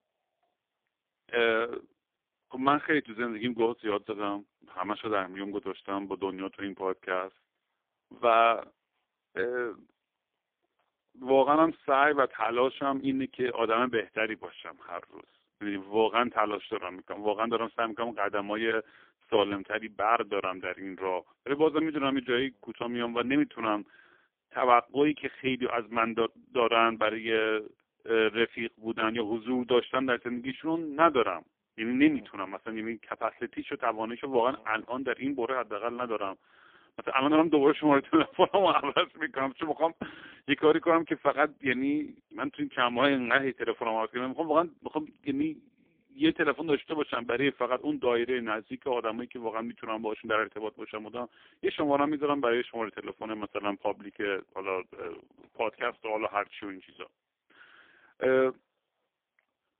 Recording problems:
phone-call audio; poor line; nothing above 3.5 kHz

